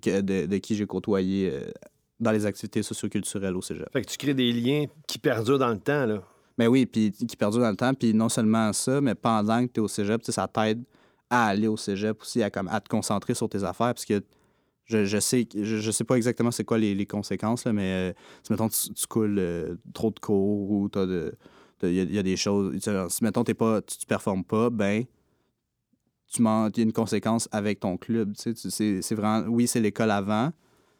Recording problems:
none

